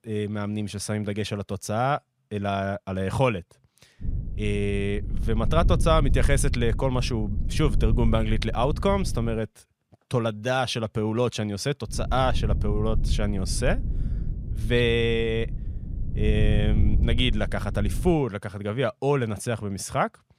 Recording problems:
low rumble; noticeable; from 4 to 9.5 s and from 12 to 18 s; 15 dB below the speech

